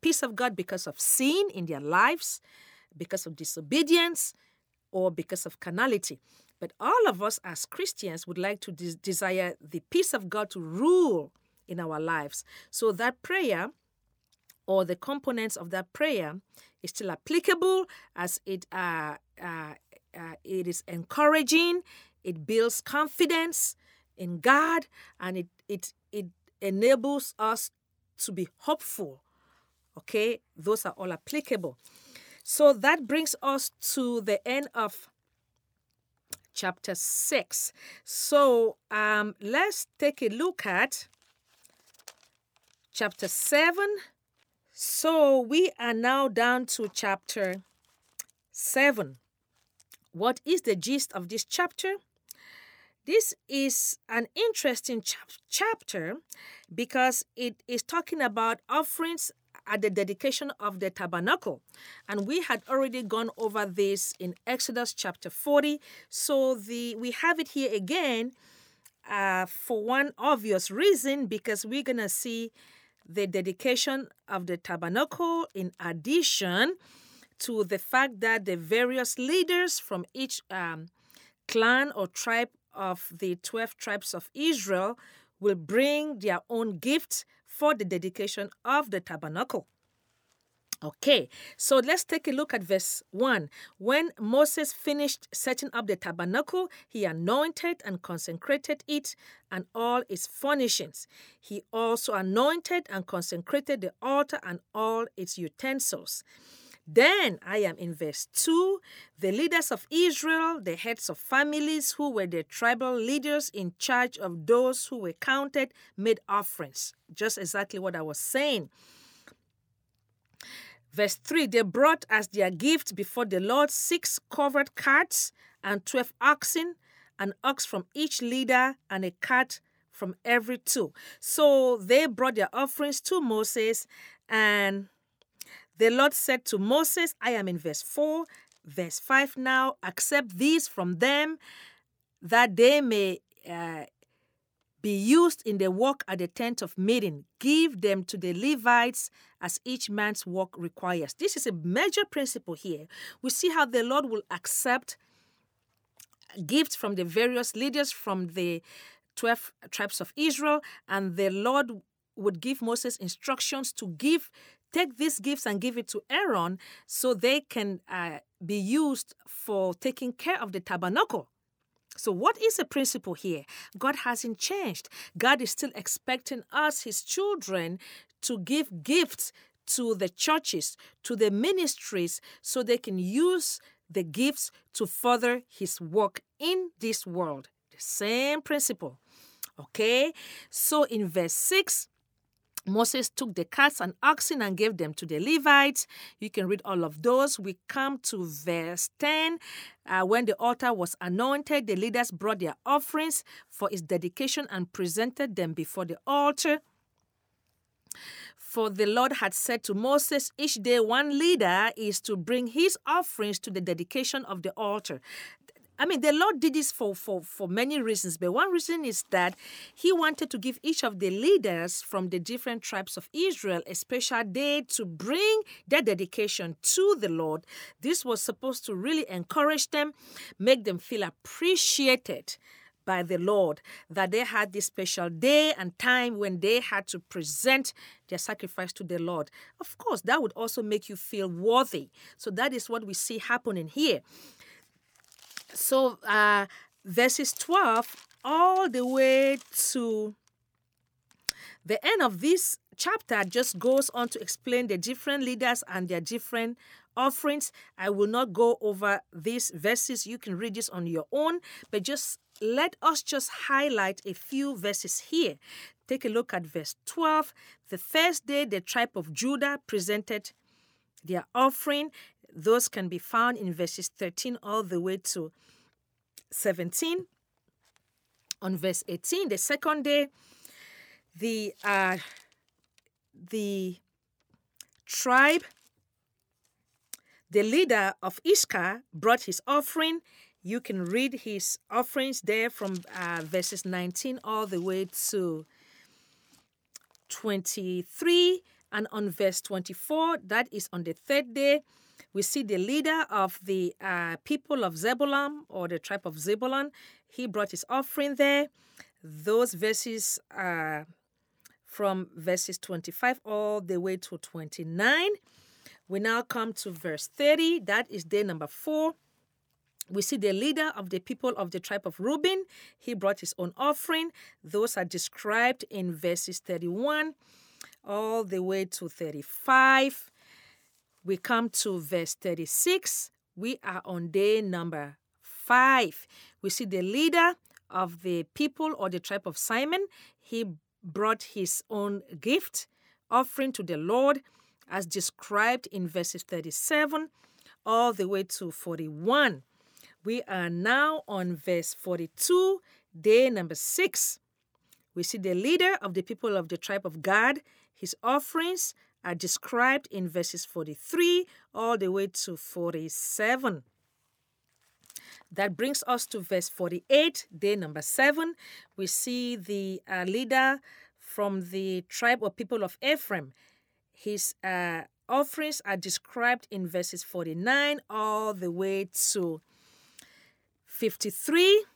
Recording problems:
none

